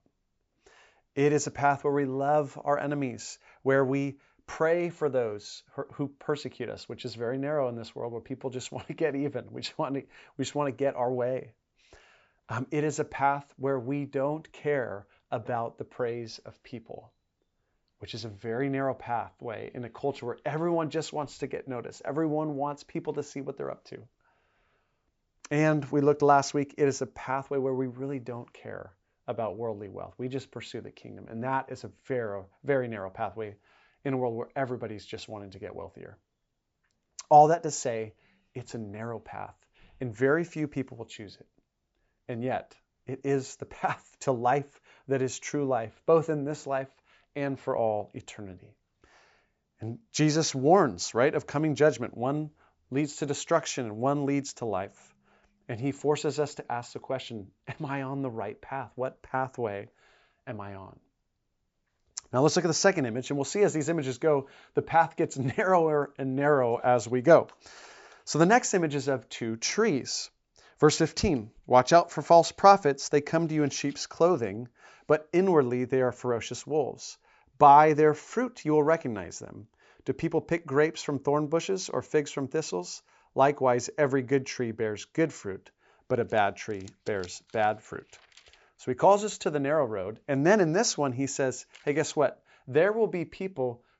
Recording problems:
high frequencies cut off; noticeable; nothing above 8 kHz

